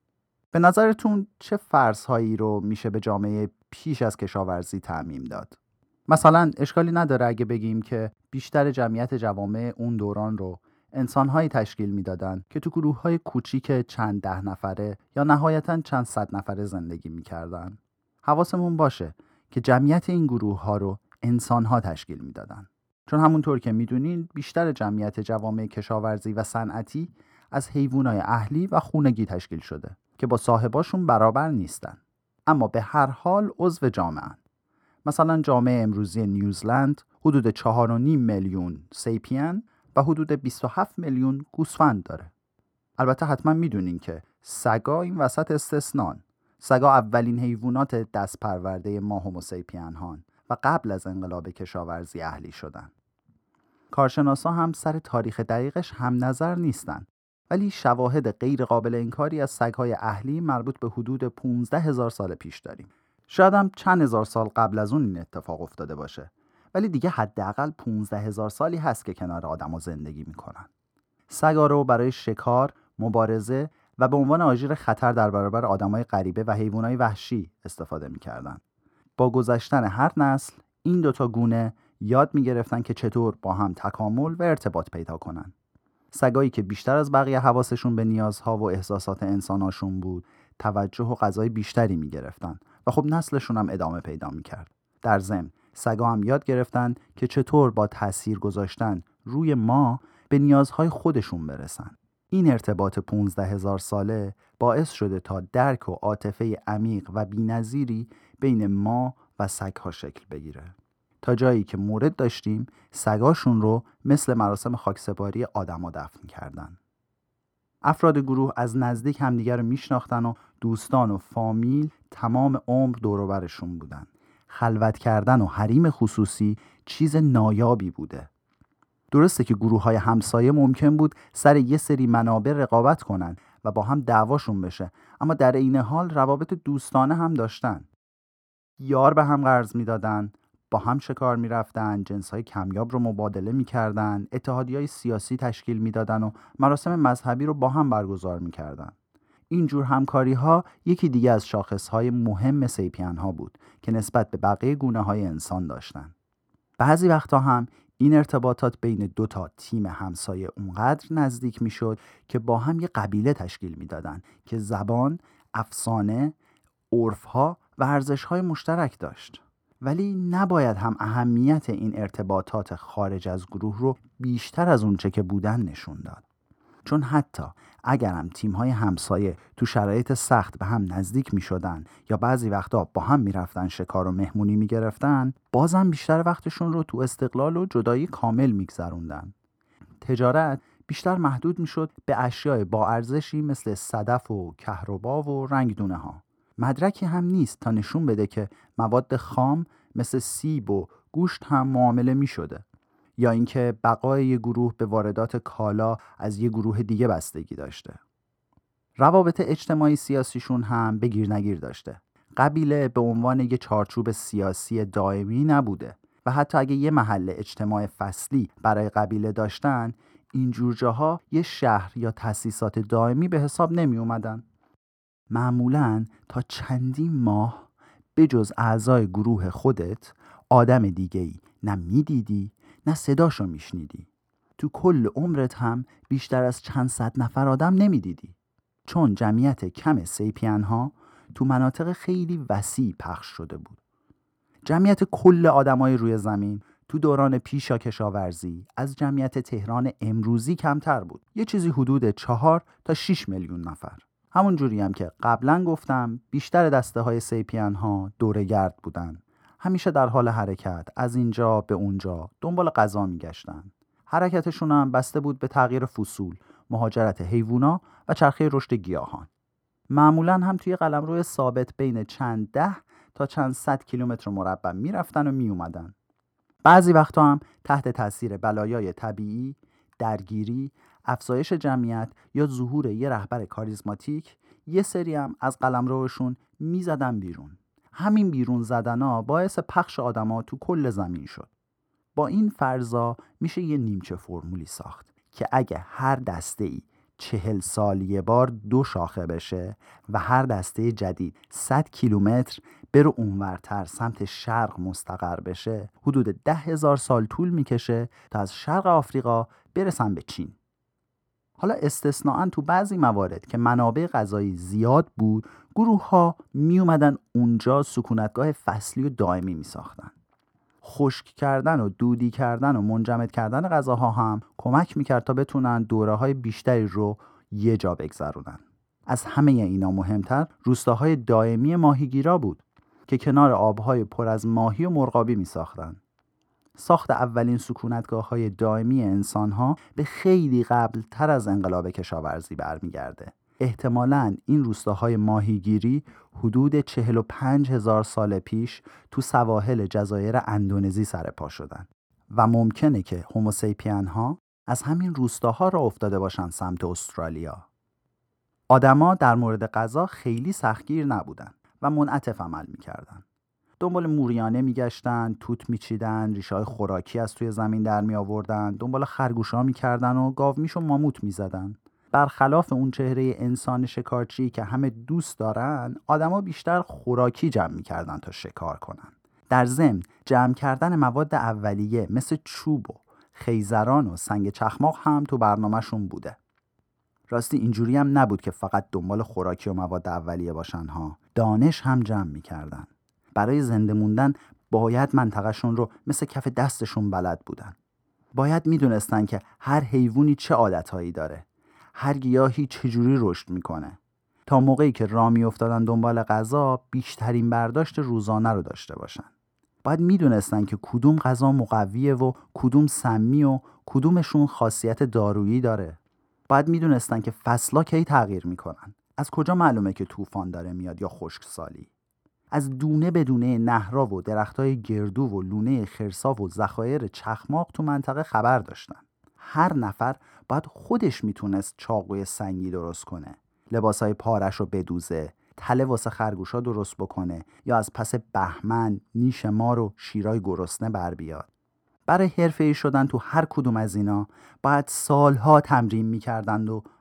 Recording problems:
muffled; slightly; fading above 2 kHz

